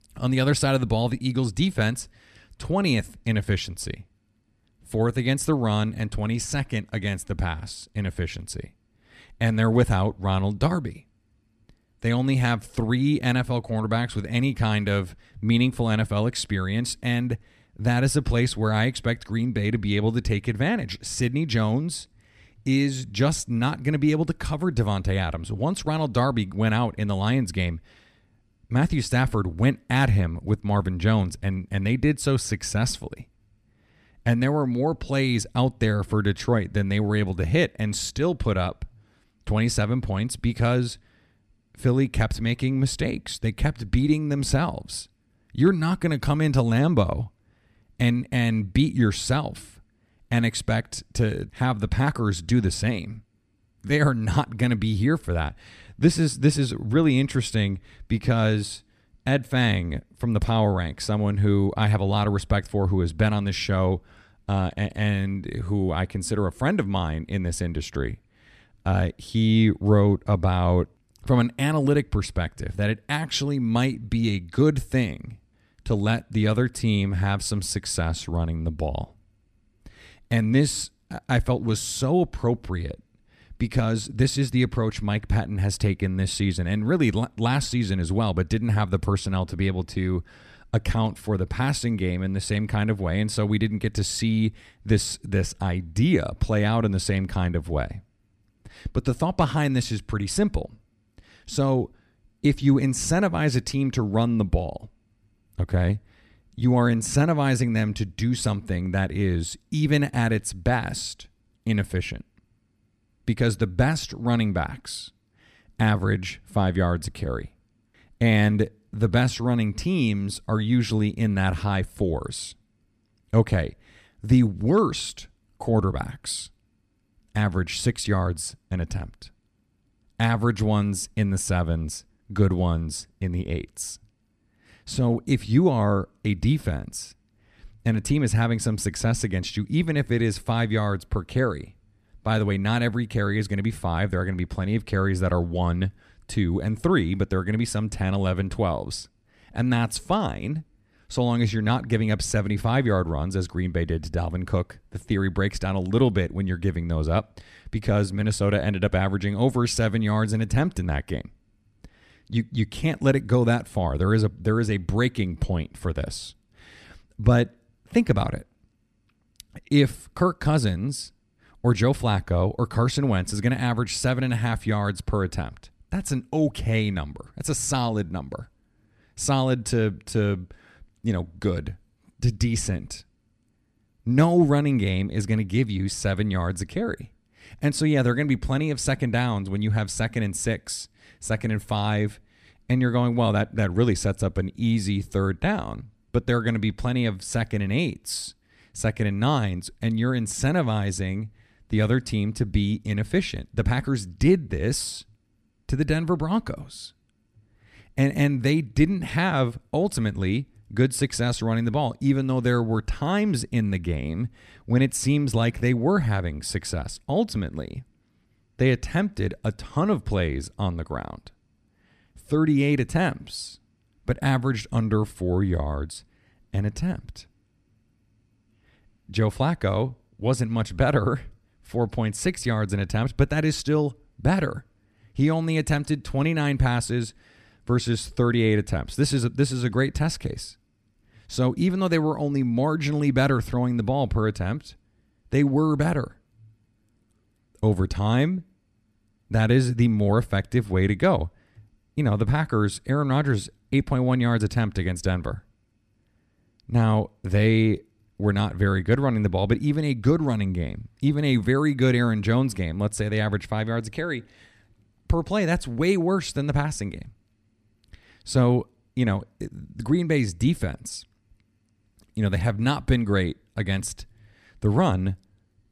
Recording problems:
none

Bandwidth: 14.5 kHz